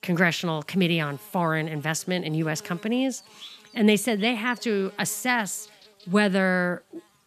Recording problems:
electrical hum; faint; throughout; 50 Hz, 25 dB below the speech

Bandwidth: 14.5 kHz